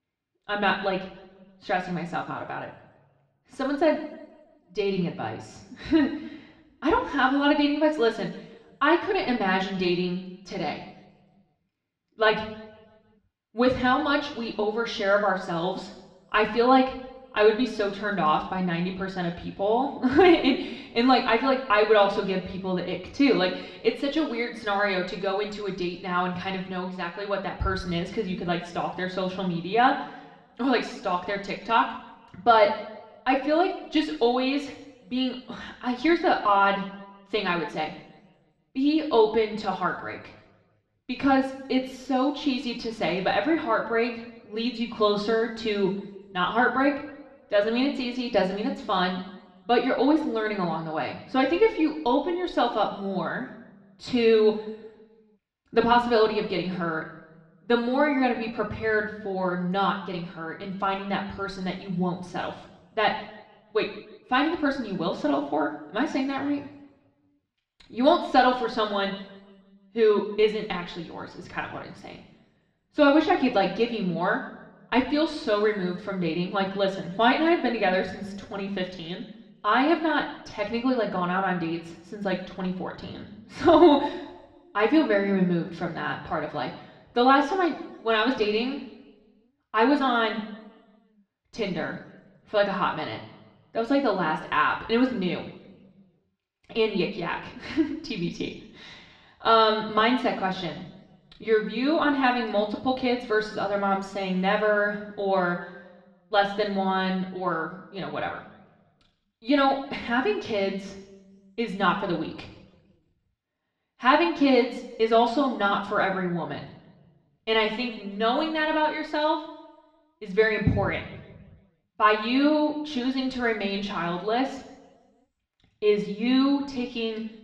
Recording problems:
muffled; slightly; fading above 2.5 kHz
room echo; slight; dies away in 0.9 s
off-mic speech; somewhat distant

